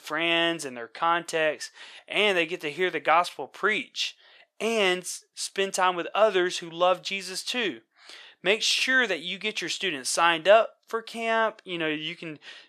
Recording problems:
thin; very; fading below 550 Hz

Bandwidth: 13.5 kHz